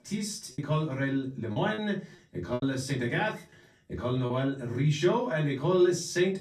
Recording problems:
off-mic speech; far
room echo; slight; dies away in 0.3 s
choppy; occasionally; 5% of the speech affected

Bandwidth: 14.5 kHz